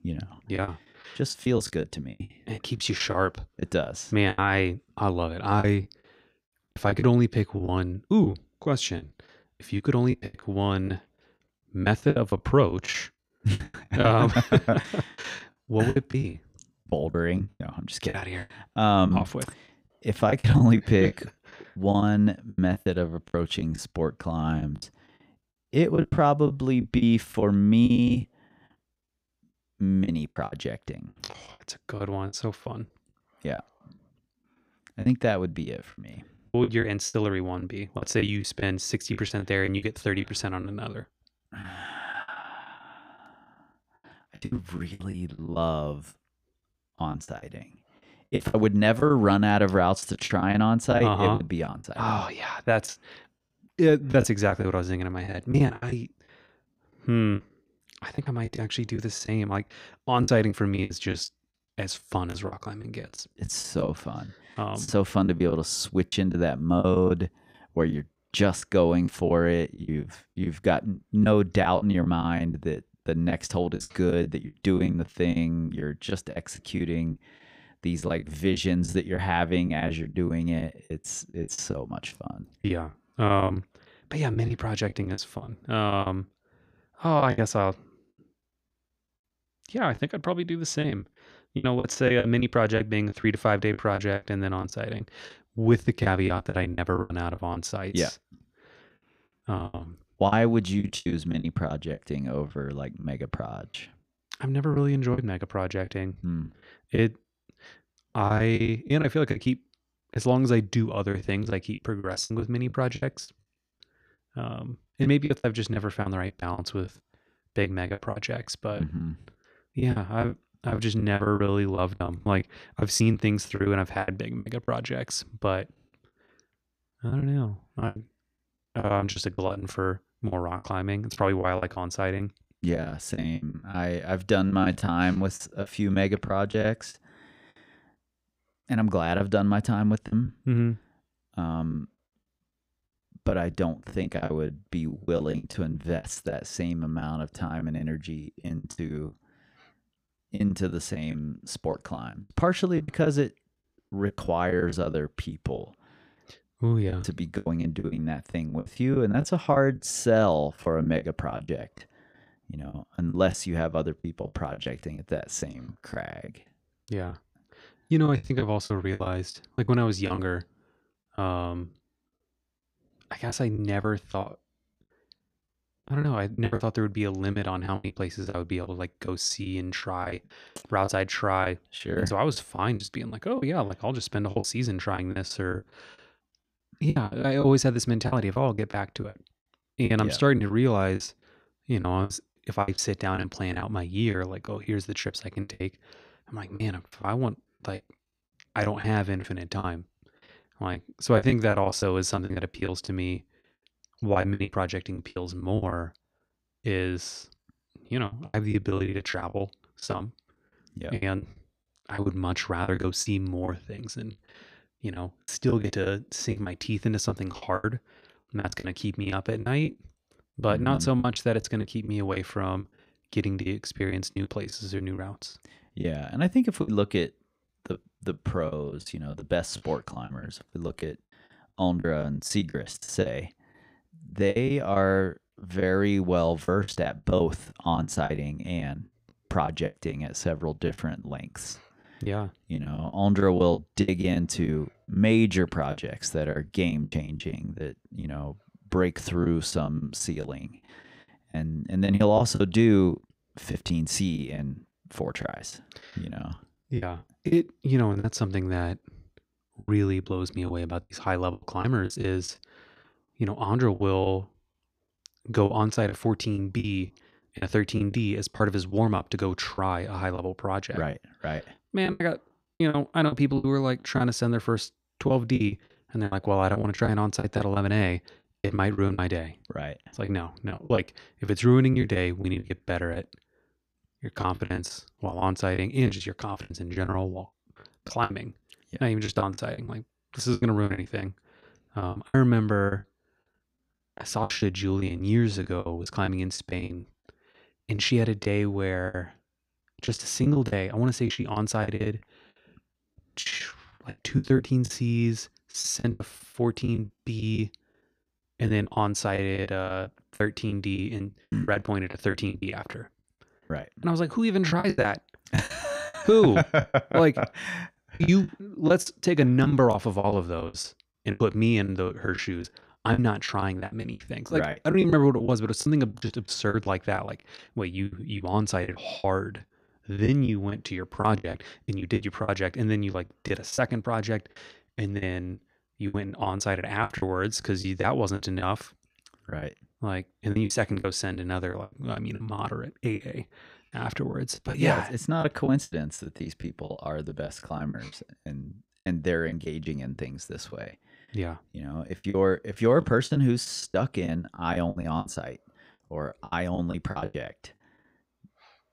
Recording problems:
choppy; very; 12% of the speech affected

